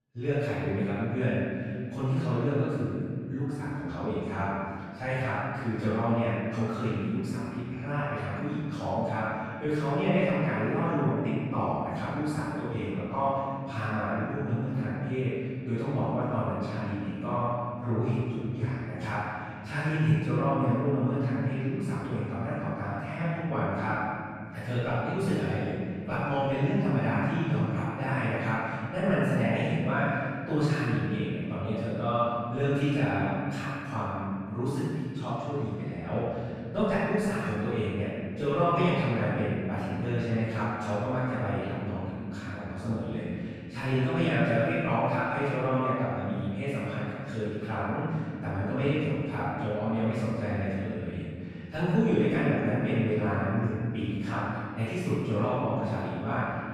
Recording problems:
room echo; strong; dies away in 2.7 s
off-mic speech; far

